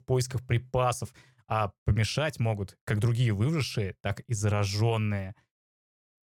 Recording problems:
none

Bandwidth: 17 kHz